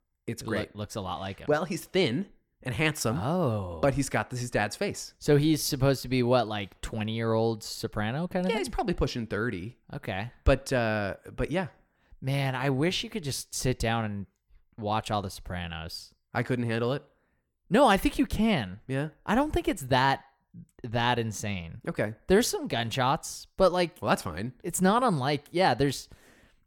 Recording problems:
none

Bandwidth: 17 kHz